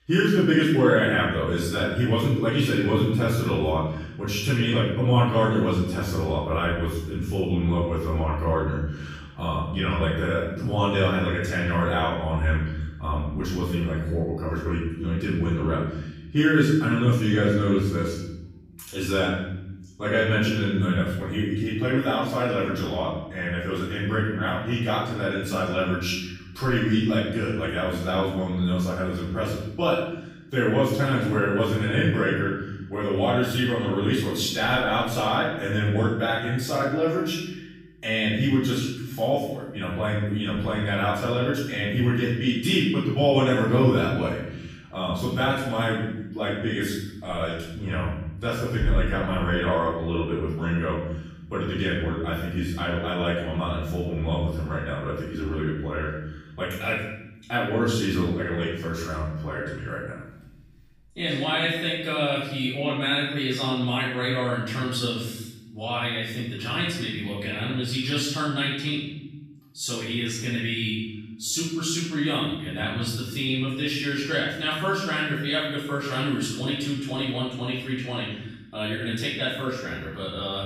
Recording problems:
off-mic speech; far
room echo; noticeable; dies away in 1.1 s

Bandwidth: 15 kHz